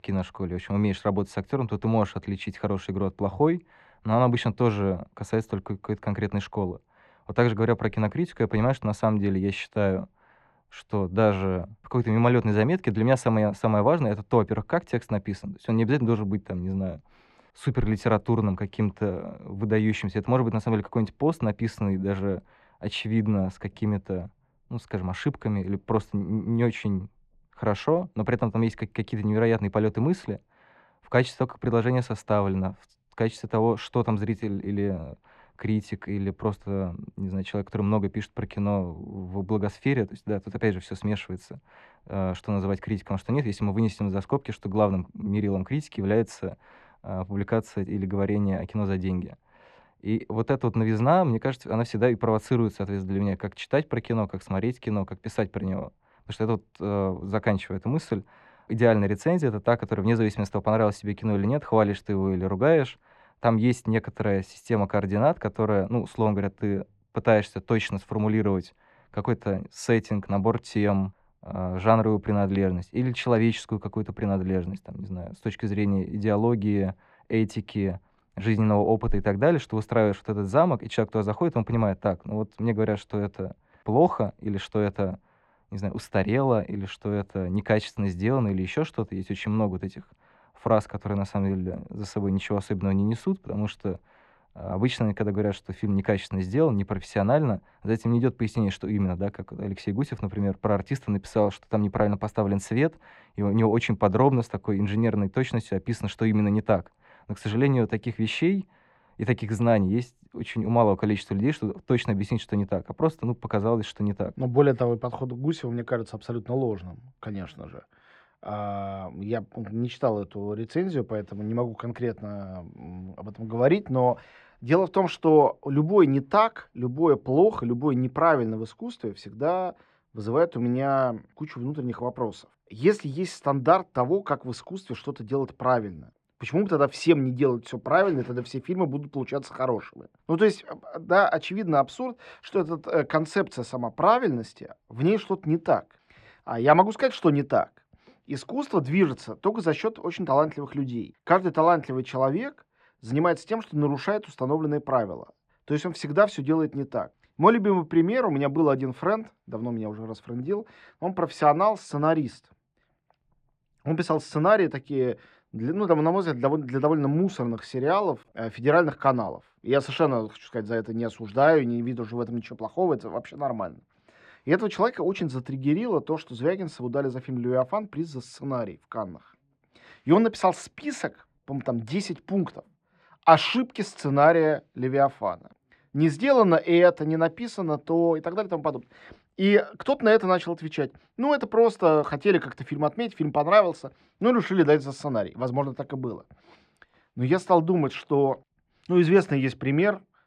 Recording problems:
muffled; very; fading above 2.5 kHz

